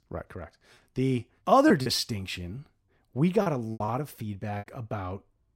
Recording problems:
choppy; very; 7% of the speech affected

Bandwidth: 16 kHz